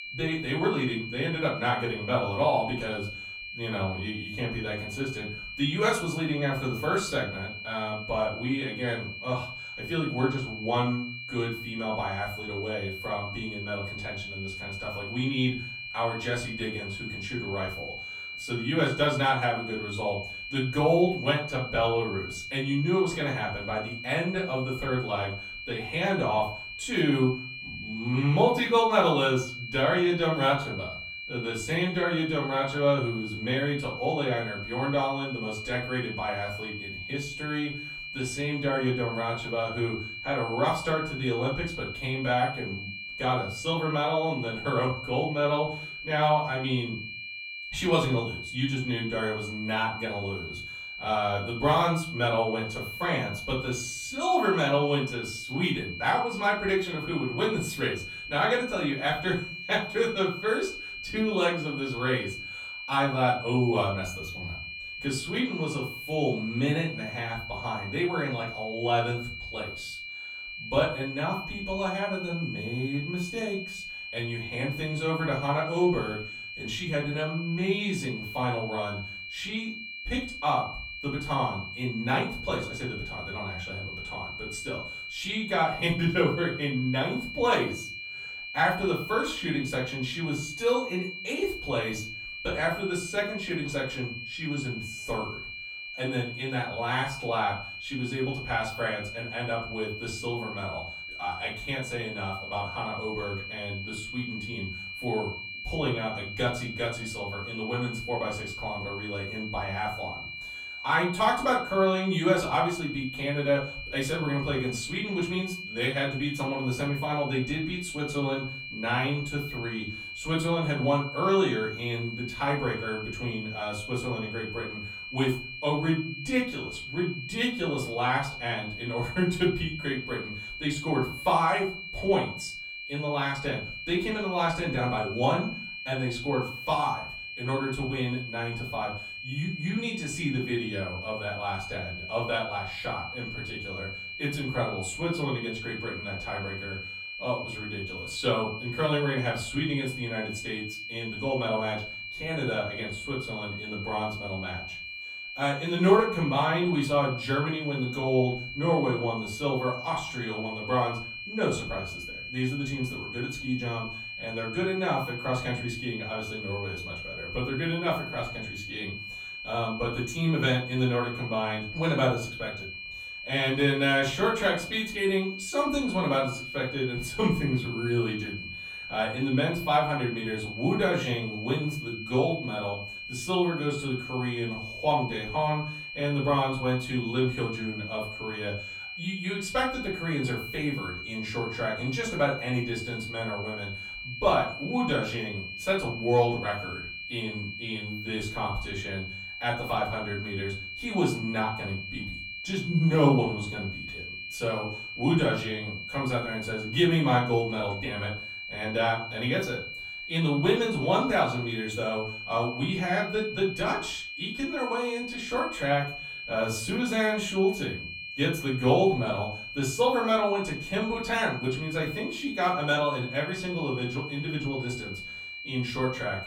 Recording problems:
off-mic speech; far
room echo; slight; dies away in 0.4 s
high-pitched whine; loud; throughout; 2.5 kHz, 7 dB below the speech

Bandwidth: 17.5 kHz